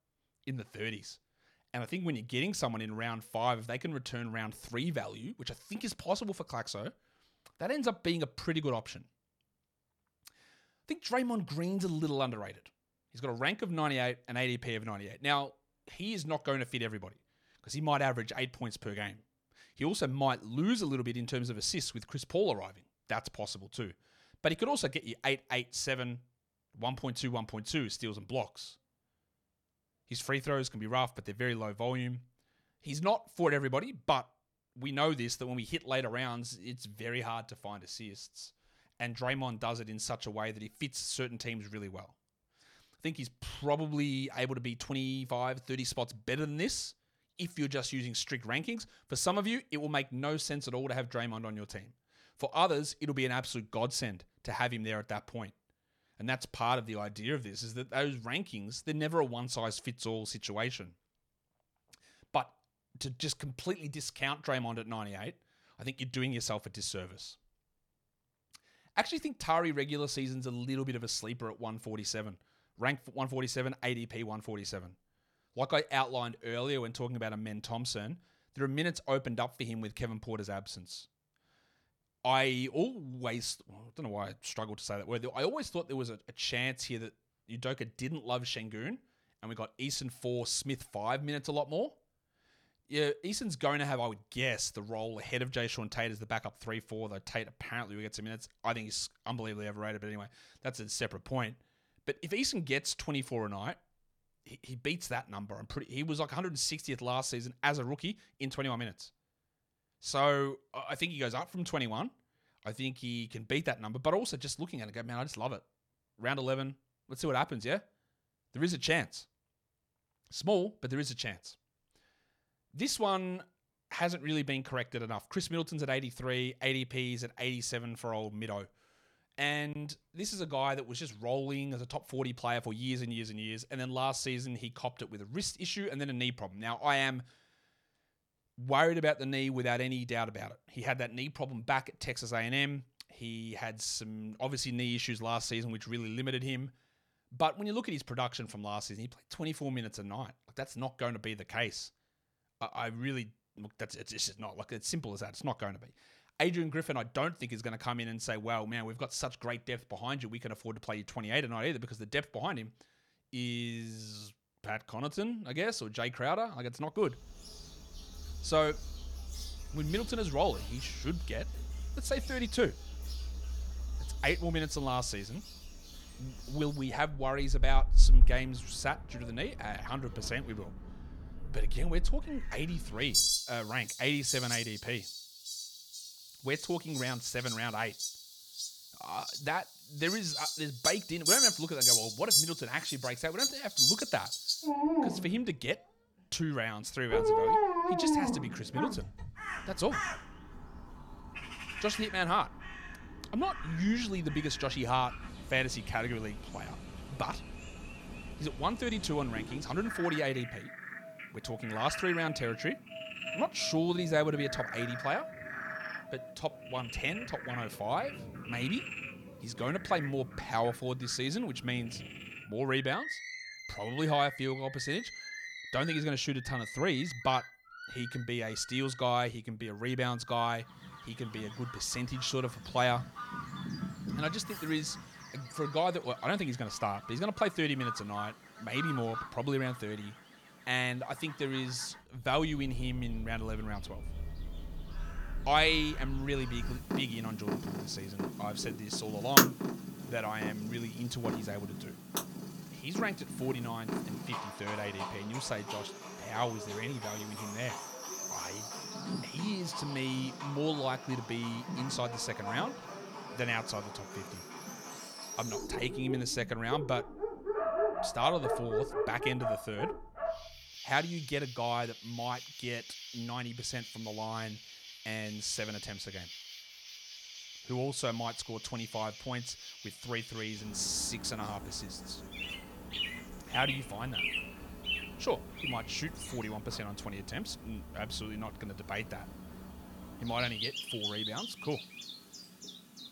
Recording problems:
animal sounds; loud; from 2:47 on; 1 dB below the speech

